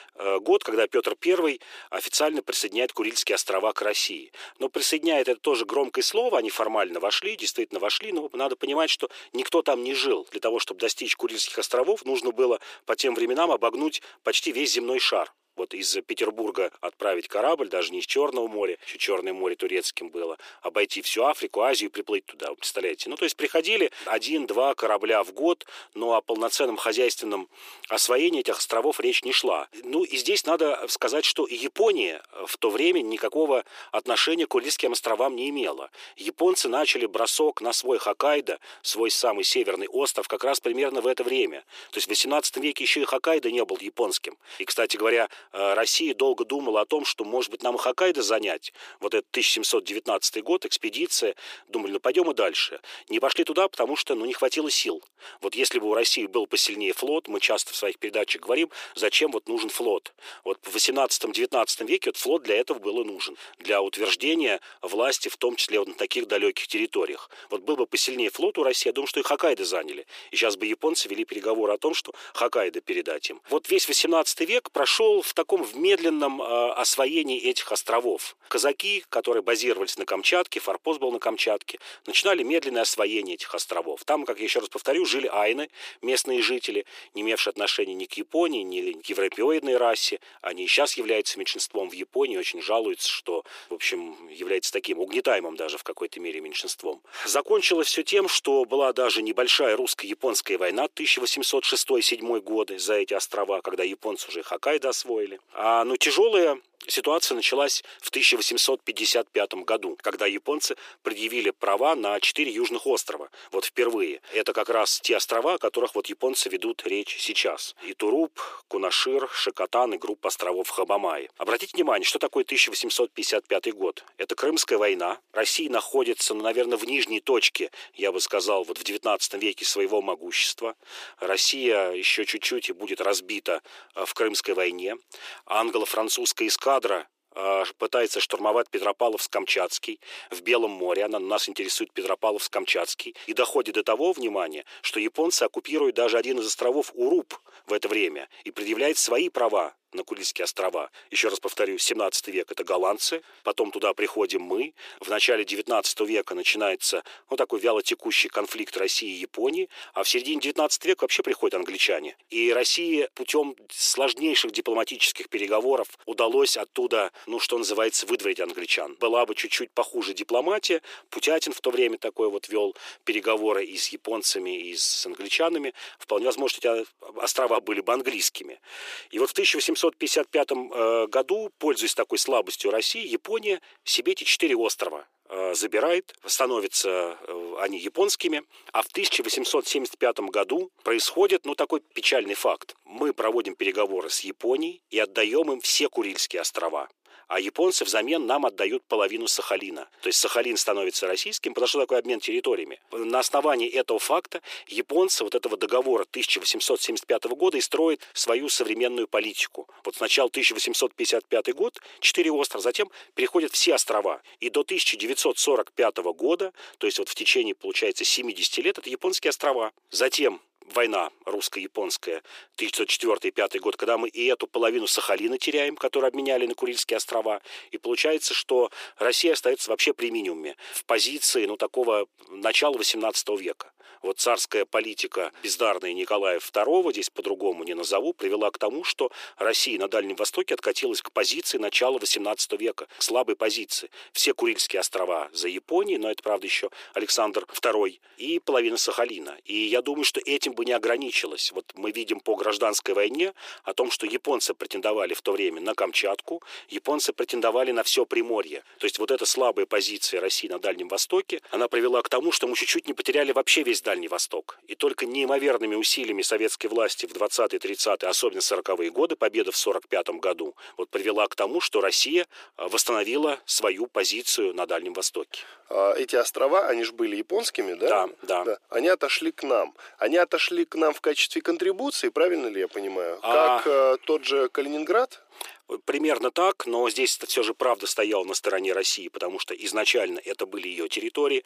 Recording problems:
thin; very; fading below 350 Hz

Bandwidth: 15 kHz